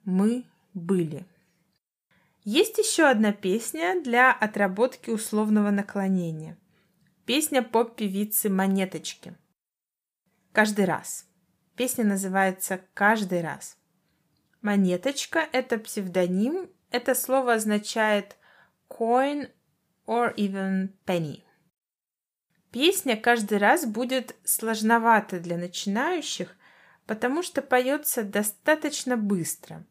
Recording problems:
none

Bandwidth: 15 kHz